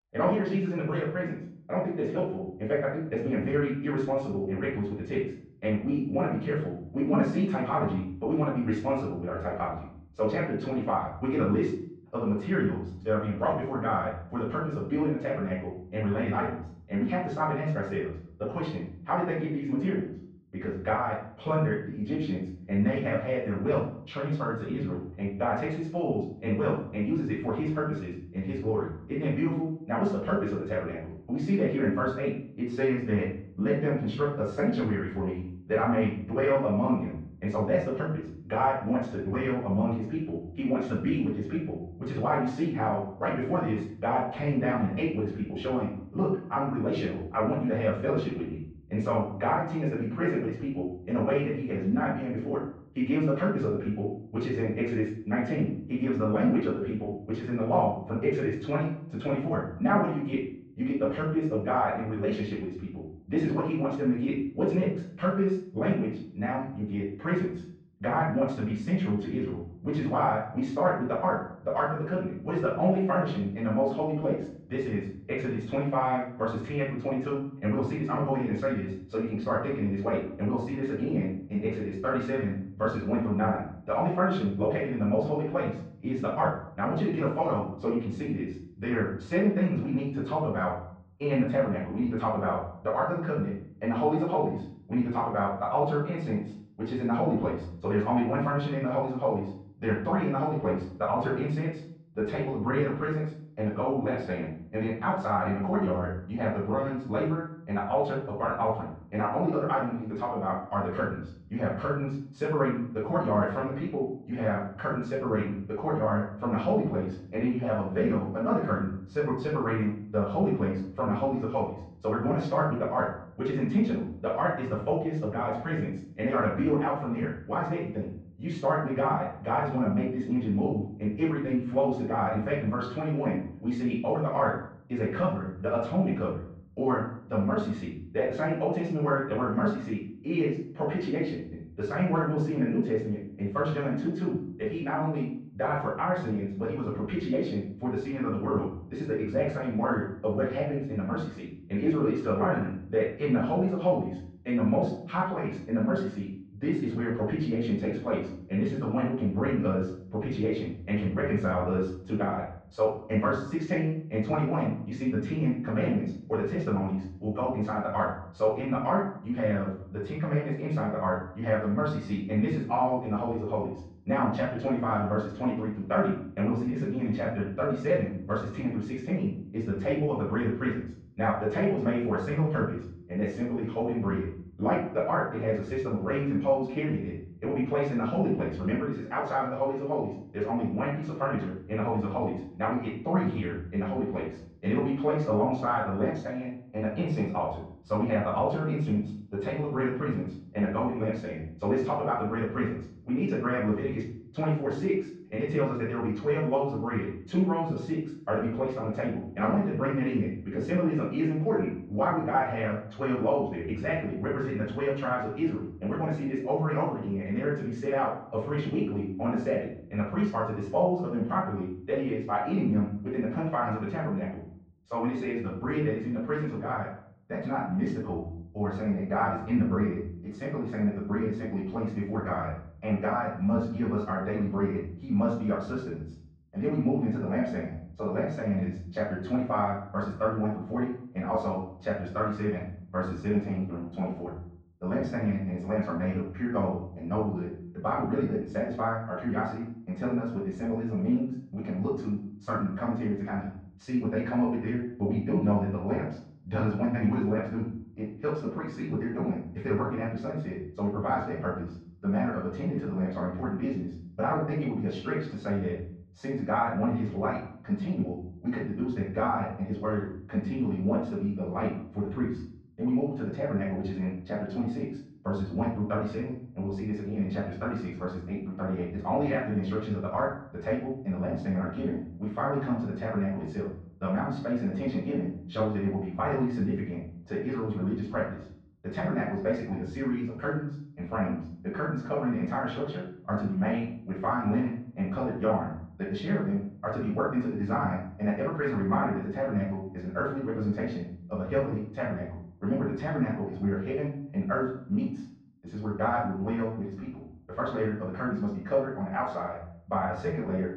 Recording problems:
off-mic speech; far
muffled; very; fading above 2 kHz
wrong speed, natural pitch; too fast; 1.6 times normal speed
room echo; noticeable; dies away in 0.5 s

